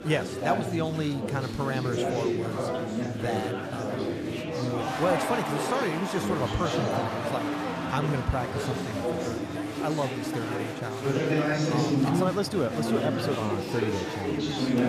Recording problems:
chatter from many people; very loud; throughout; 2 dB above the speech

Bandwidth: 14.5 kHz